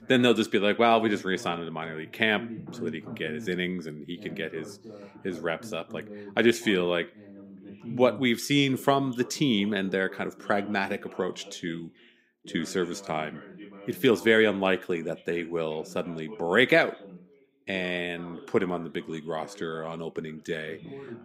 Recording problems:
background chatter; noticeable; throughout; 2 voices, 20 dB below the speech

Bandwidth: 15.5 kHz